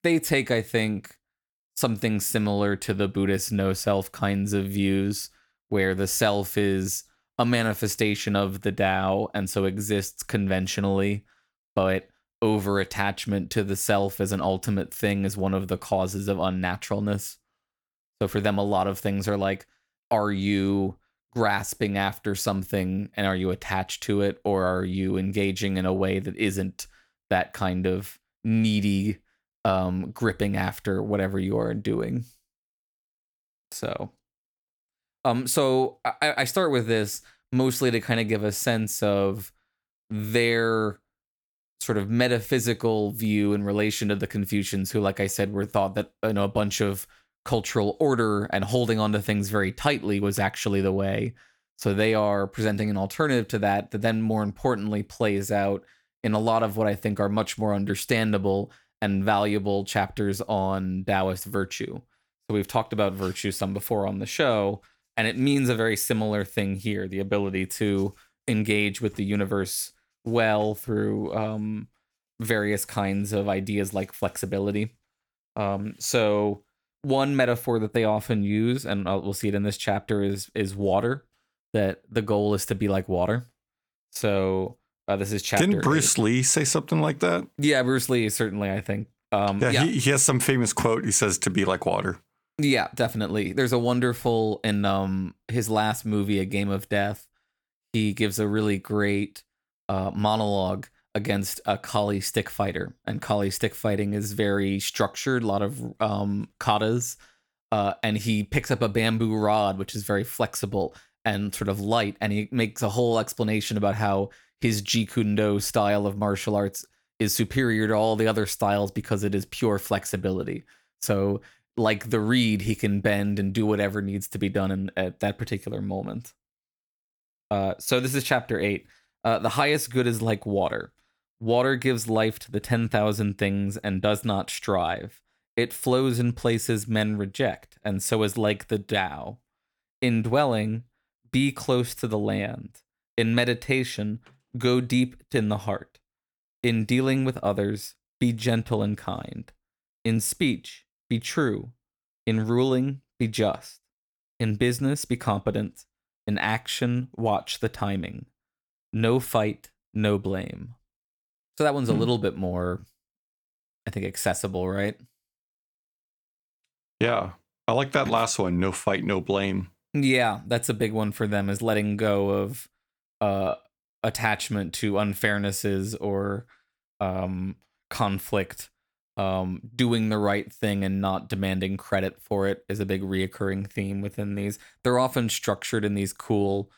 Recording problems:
none

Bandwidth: 18.5 kHz